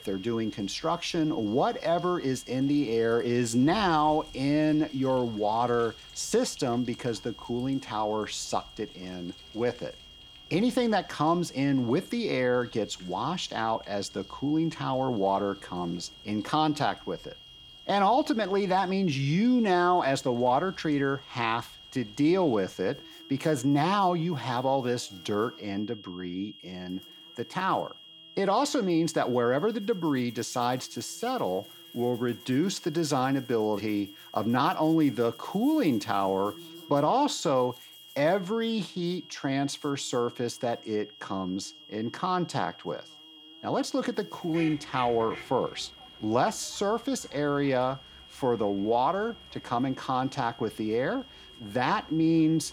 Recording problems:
high-pitched whine; noticeable; throughout; 3.5 kHz, 20 dB below the speech
animal sounds; faint; throughout; 25 dB below the speech

